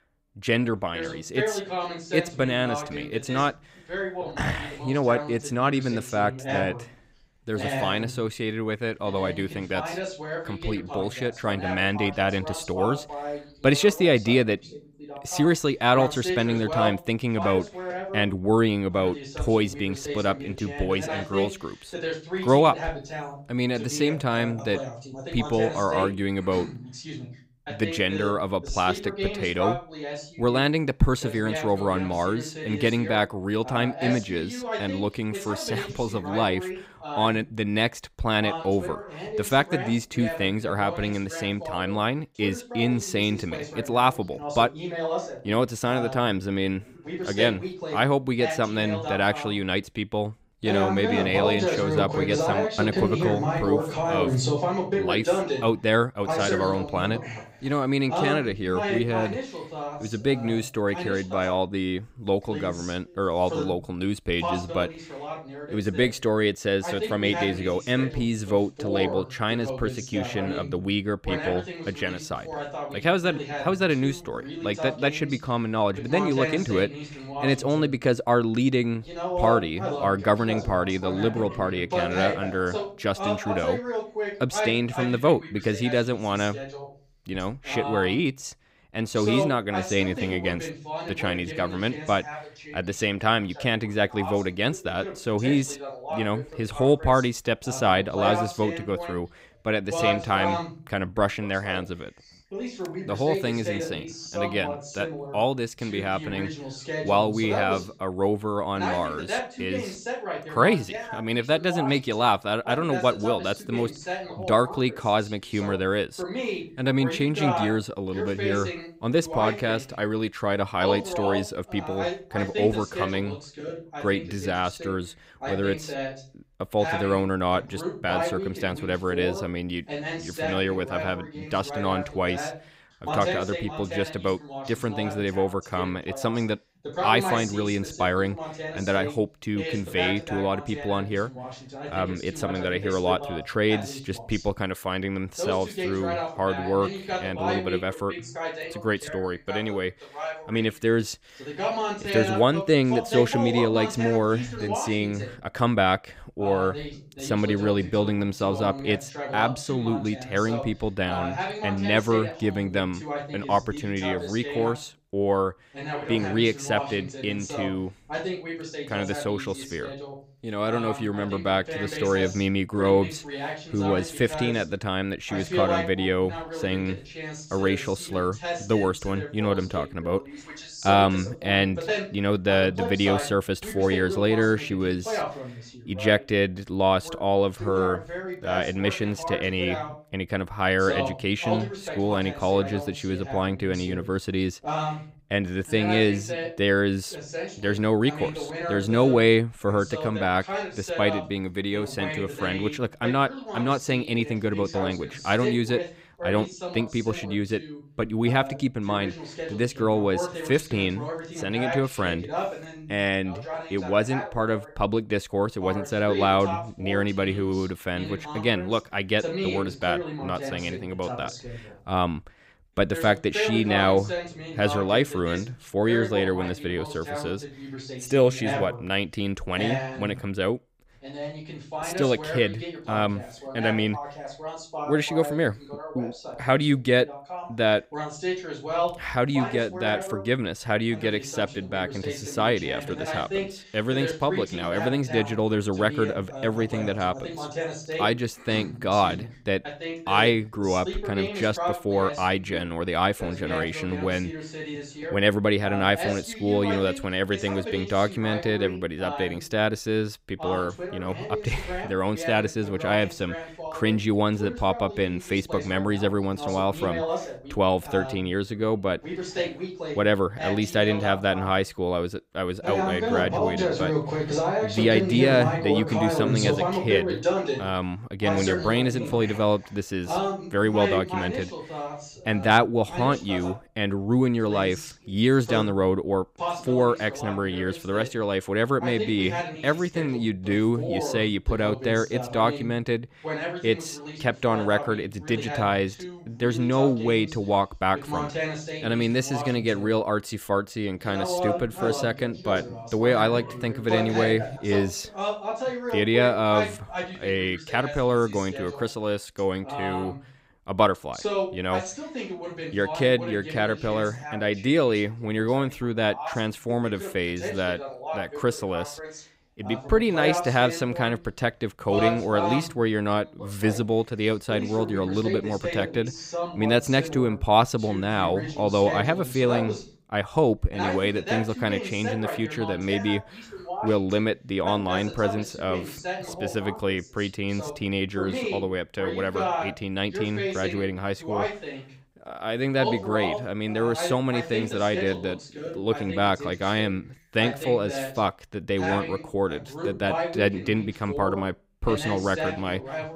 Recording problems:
voice in the background; loud; throughout; 7 dB below the speech

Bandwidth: 15.5 kHz